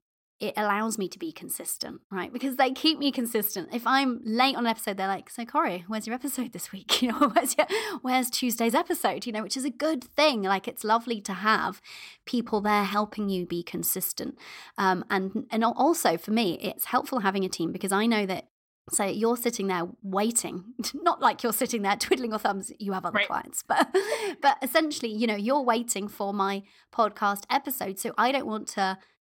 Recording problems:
none

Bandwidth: 16.5 kHz